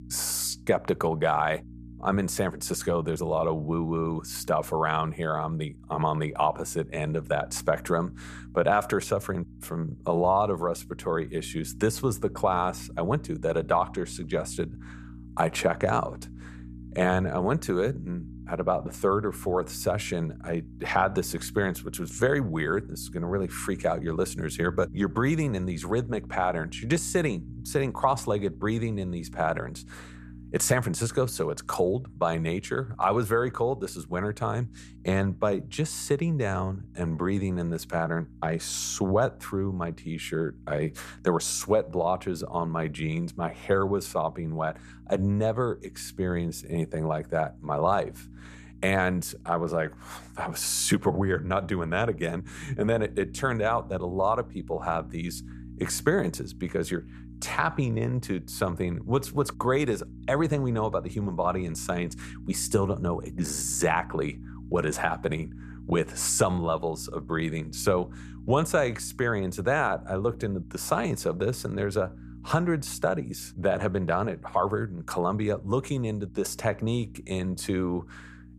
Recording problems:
electrical hum; faint; throughout; 60 Hz, 25 dB below the speech

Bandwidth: 14.5 kHz